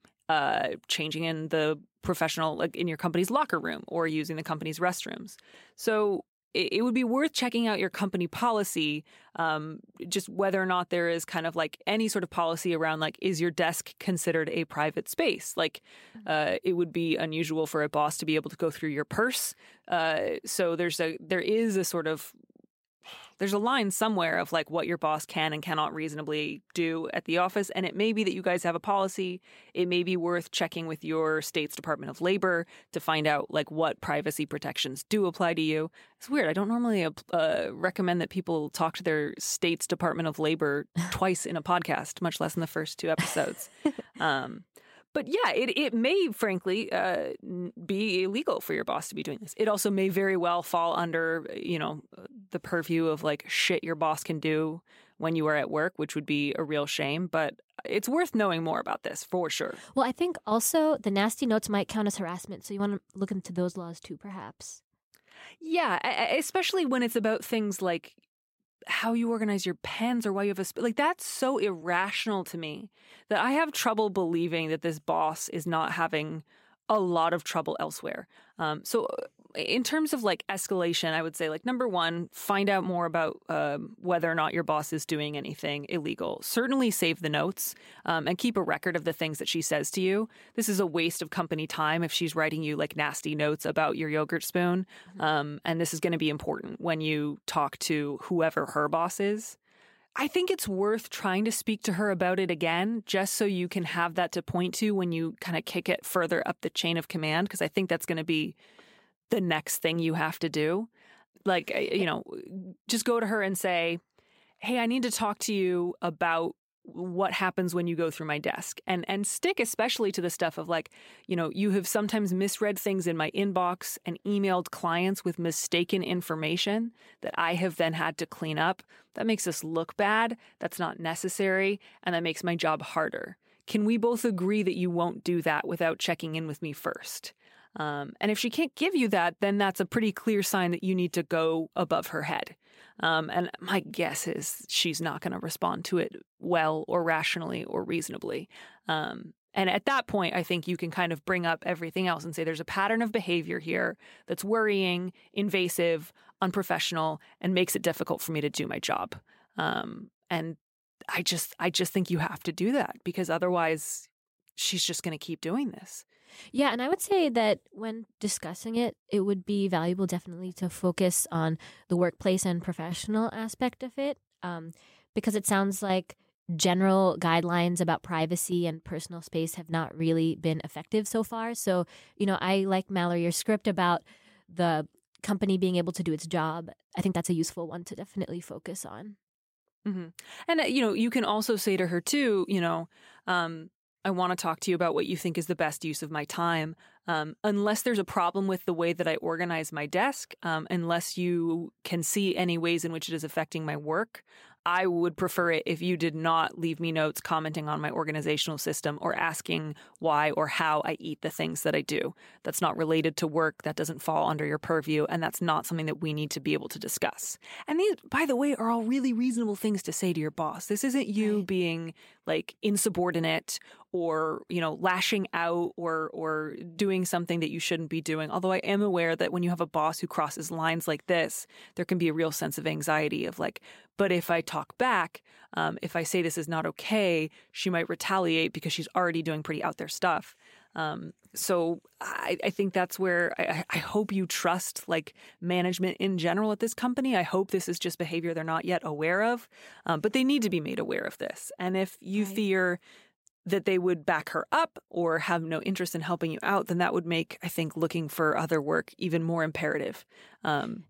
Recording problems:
uneven, jittery; strongly; from 37 s to 4:08

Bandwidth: 16 kHz